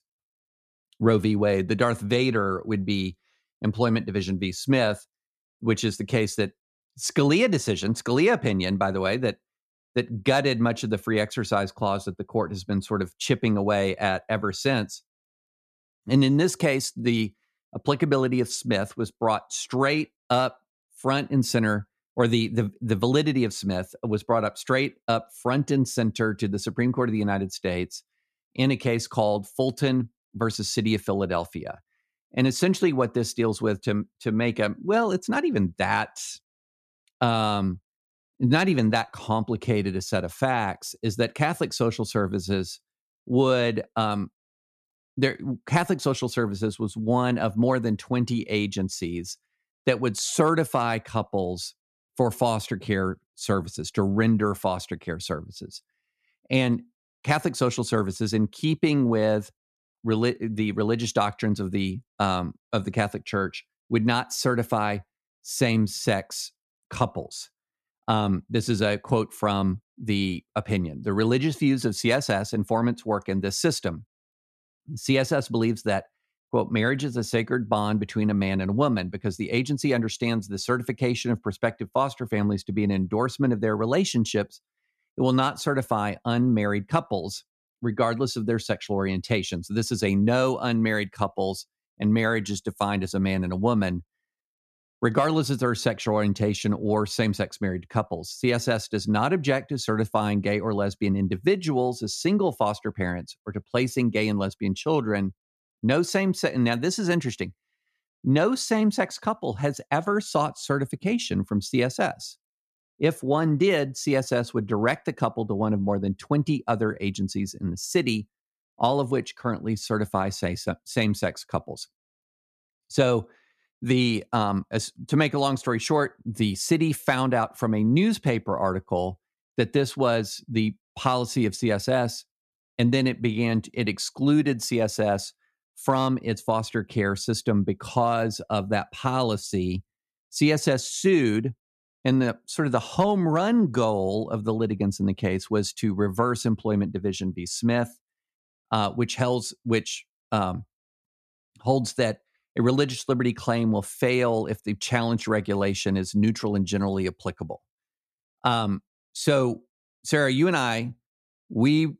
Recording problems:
none

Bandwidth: 13.5 kHz